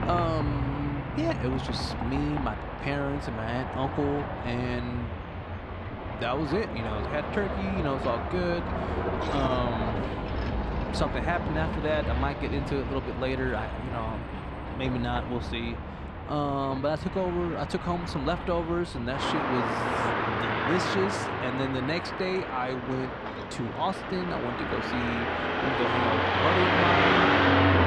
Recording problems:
traffic noise; very loud; throughout; 1 dB above the speech

